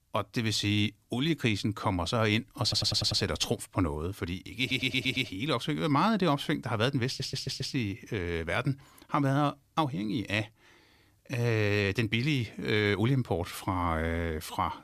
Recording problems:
audio stuttering; at 2.5 s, at 4.5 s and at 7 s

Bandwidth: 14.5 kHz